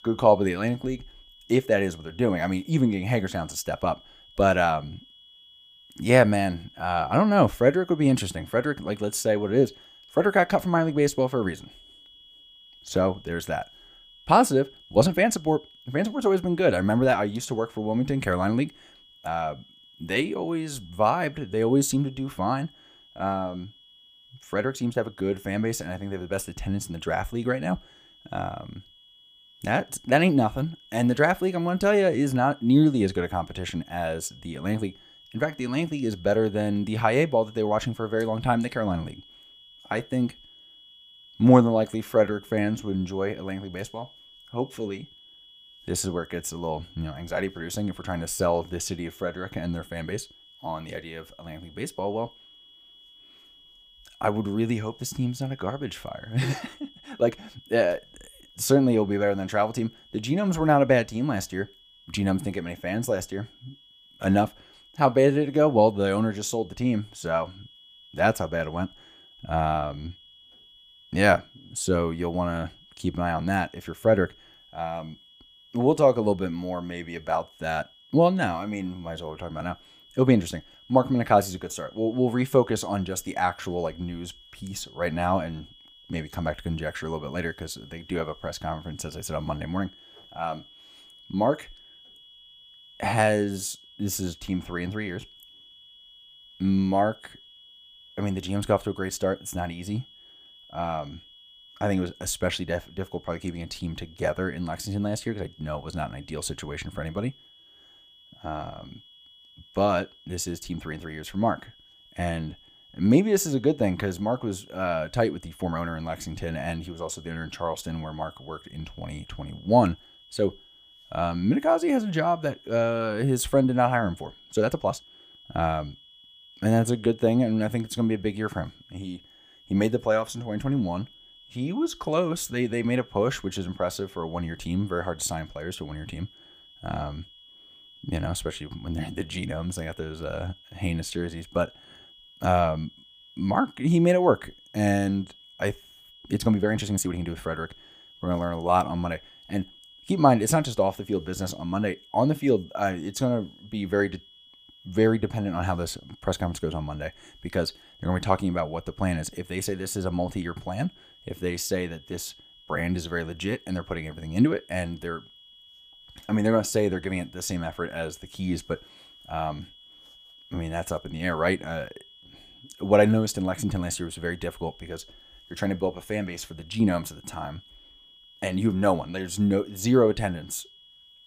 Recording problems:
high-pitched whine; faint; throughout; 3.5 kHz, 25 dB below the speech
uneven, jittery; strongly; from 15 s to 2:29

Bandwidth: 15 kHz